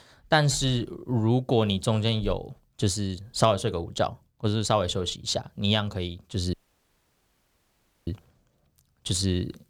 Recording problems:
audio cutting out; at 6.5 s for 1.5 s

